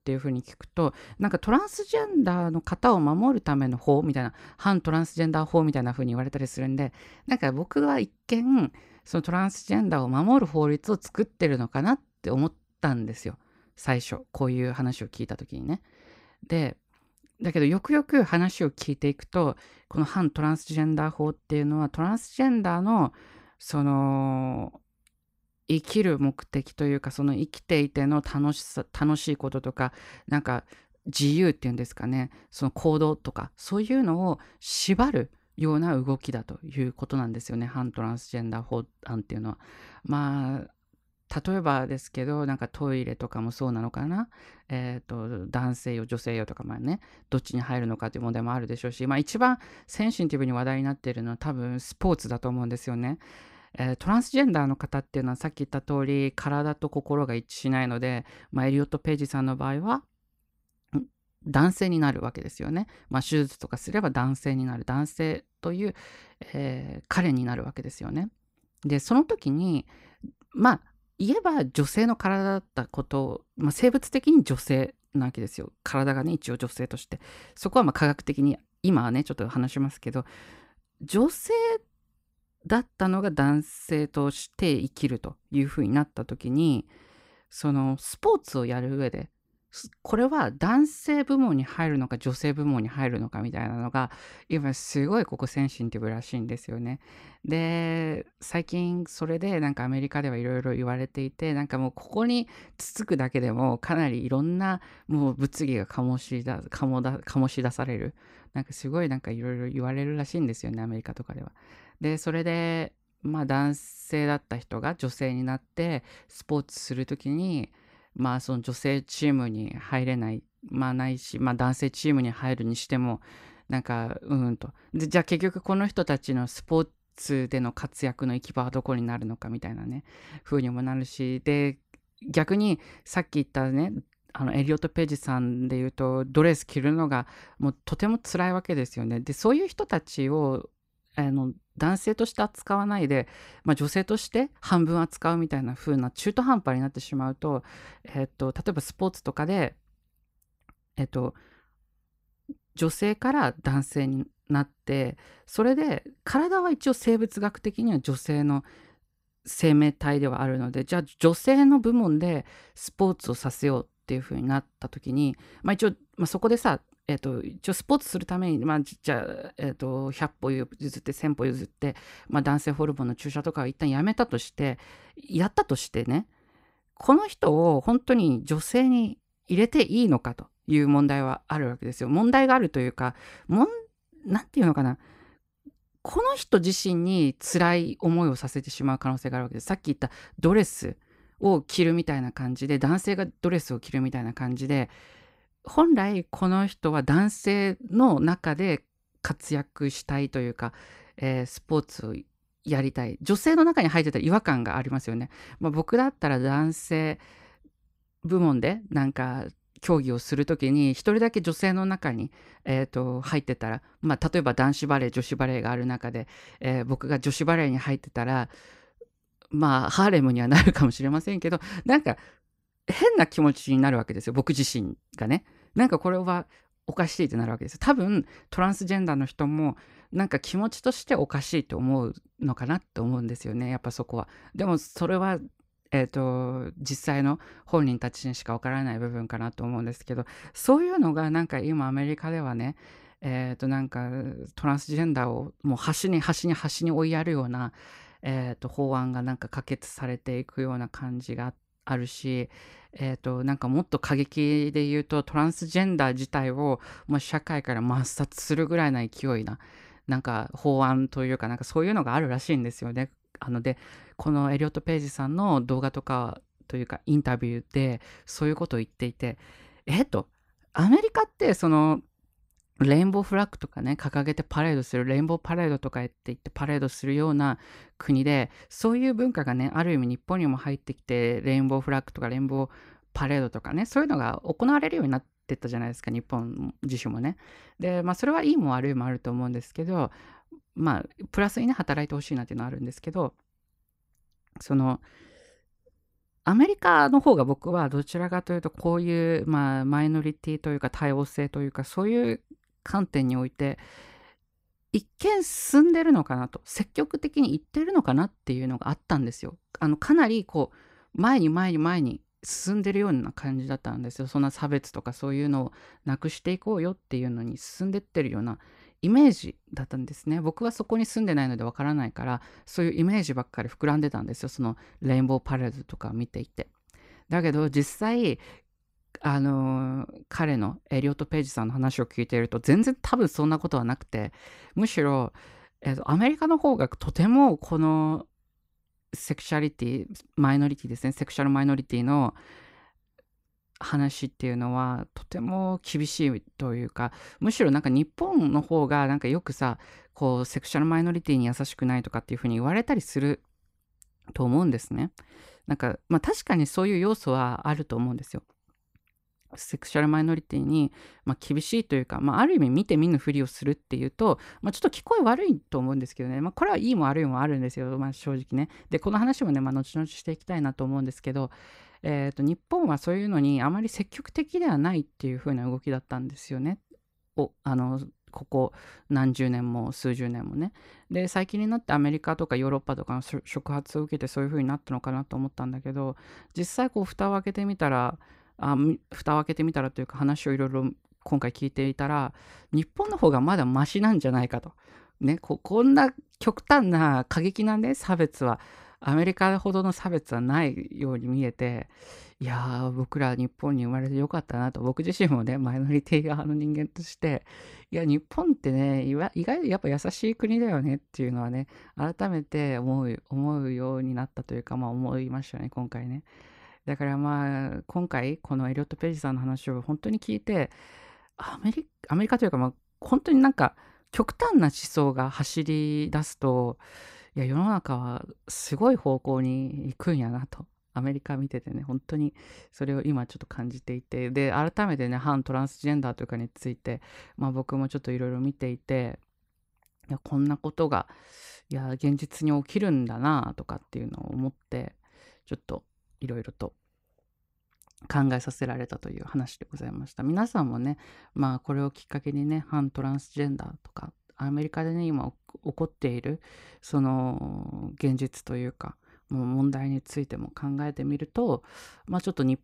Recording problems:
none

